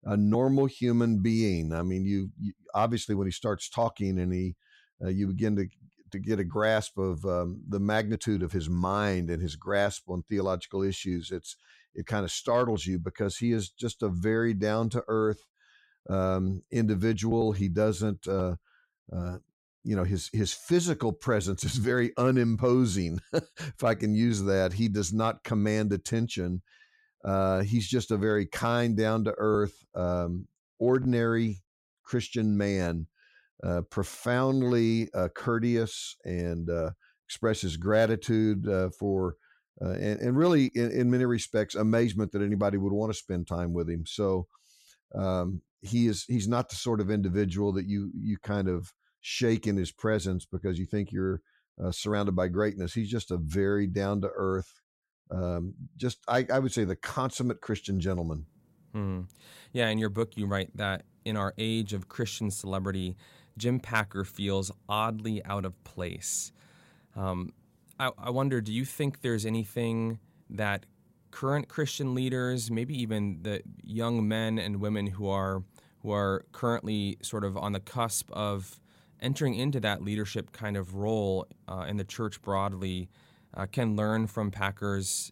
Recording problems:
none

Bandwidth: 16 kHz